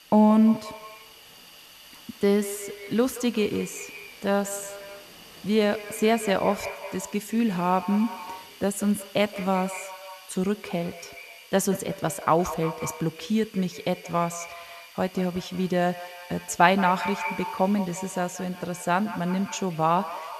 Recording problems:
echo of what is said; noticeable; throughout; 180 ms later, 15 dB below the speech
rain or running water; faint; throughout; 30 dB below the speech
hiss; faint; throughout; 20 dB below the speech

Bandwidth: 13.5 kHz